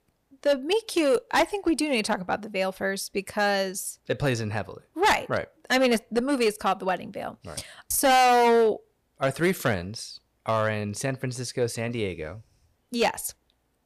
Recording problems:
distortion; heavy; 5% of the sound clipped

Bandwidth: 15 kHz